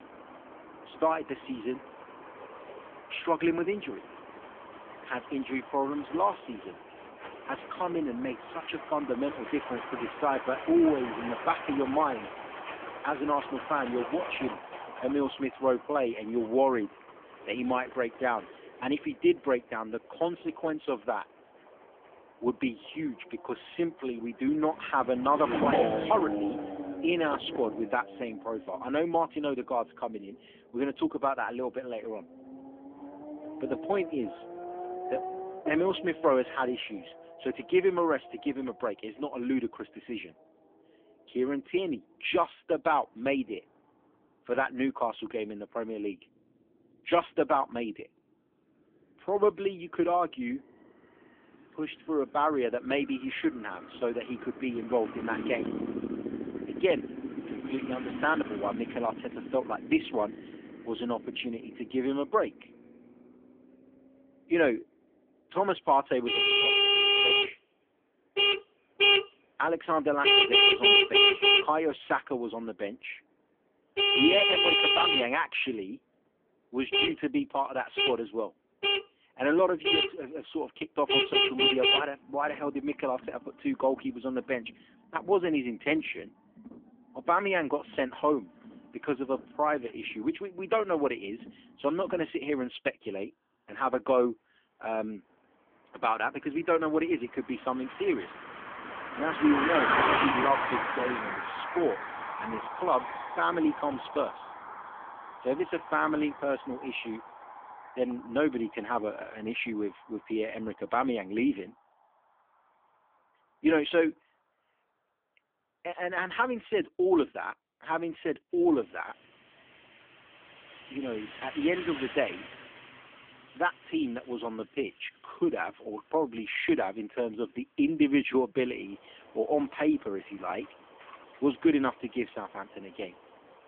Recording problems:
phone-call audio; poor line; nothing above 3.5 kHz
traffic noise; very loud; throughout; 3 dB above the speech

